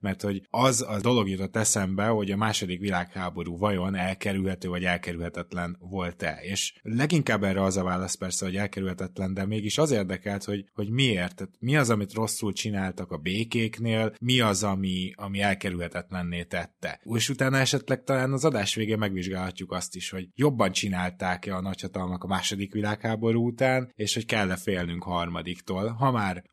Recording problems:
none

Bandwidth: 13.5 kHz